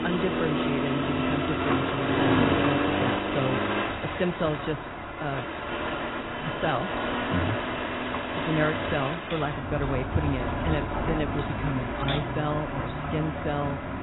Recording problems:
garbled, watery; badly; nothing above 4 kHz
traffic noise; very loud; throughout; 2 dB above the speech
wind noise on the microphone; occasional gusts; 15 dB below the speech
keyboard typing; noticeable; from 8.5 to 12 s; peak 5 dB below the speech

